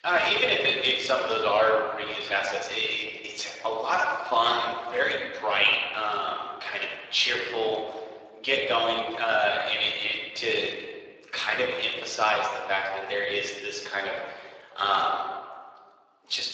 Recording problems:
thin; very; fading below 450 Hz
room echo; noticeable; dies away in 1.6 s
off-mic speech; somewhat distant
garbled, watery; slightly

